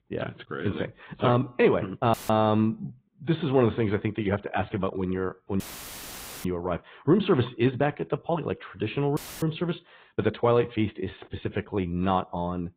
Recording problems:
high frequencies cut off; severe; nothing above 4 kHz
garbled, watery; slightly
uneven, jittery; strongly; from 1 to 12 s
audio cutting out; filled with static; at 2 s, at 5.5 s for 1 s and at 9 s

